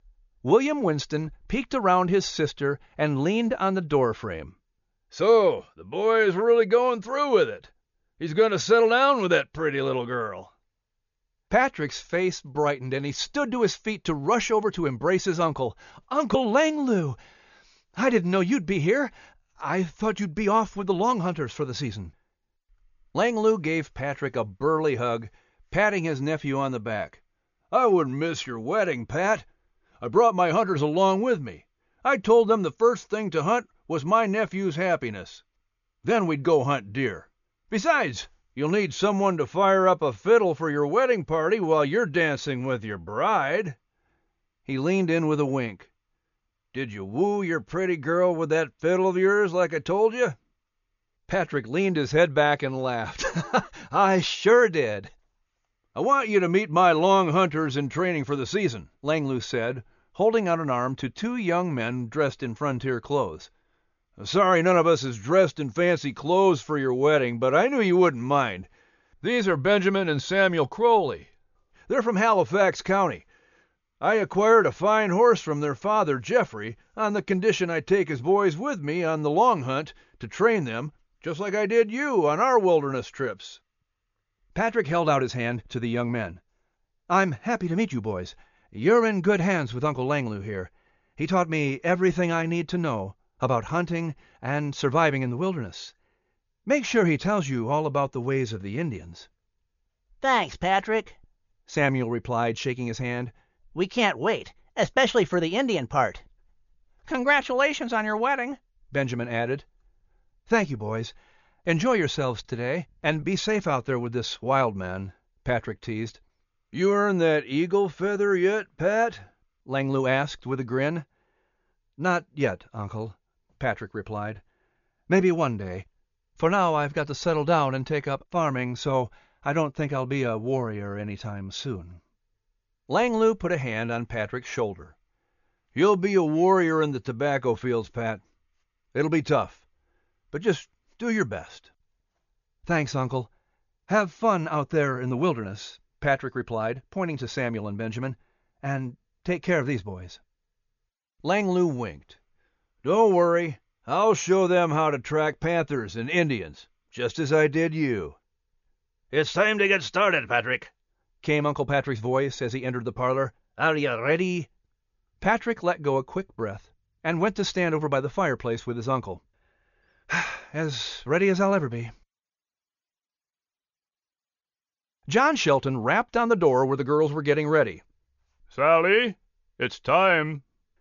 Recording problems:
high frequencies cut off; noticeable; nothing above 7 kHz

